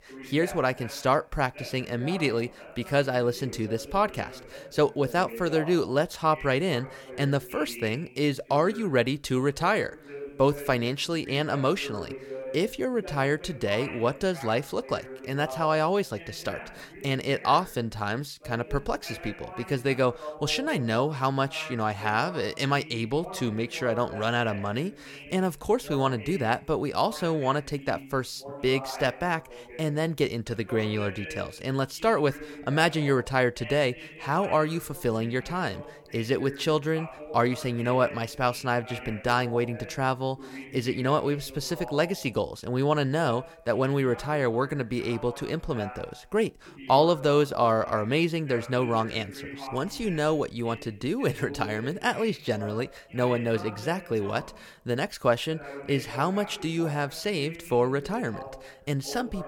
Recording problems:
voice in the background; noticeable; throughout; 15 dB below the speech

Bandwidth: 18 kHz